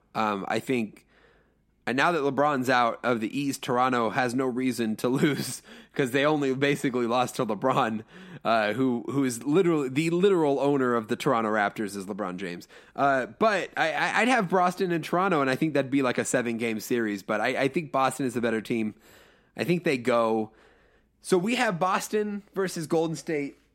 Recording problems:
none

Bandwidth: 16 kHz